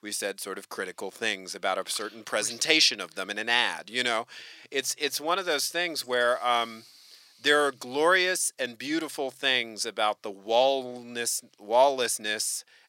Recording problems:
thin; somewhat; fading below 550 Hz

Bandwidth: 16 kHz